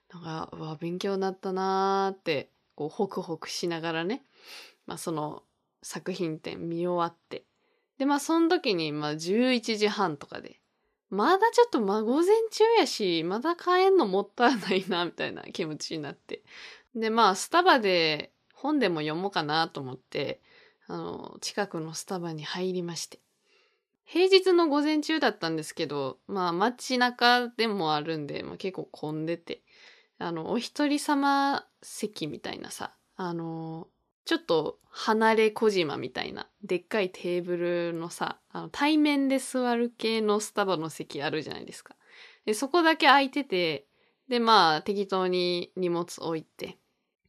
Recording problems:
none

